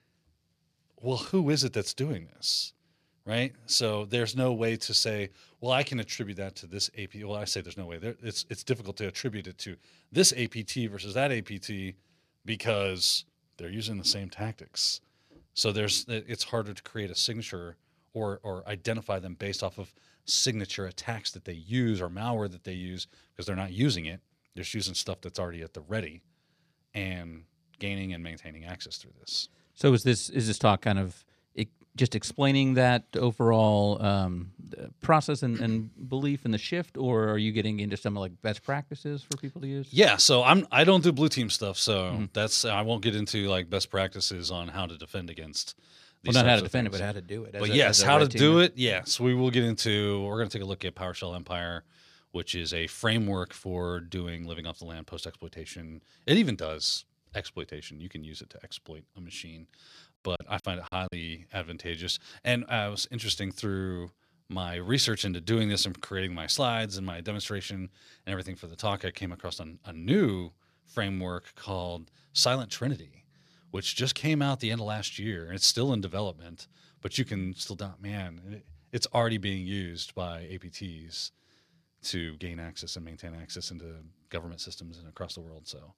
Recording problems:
choppy; very; at 1:00; 10% of the speech affected

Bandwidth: 14 kHz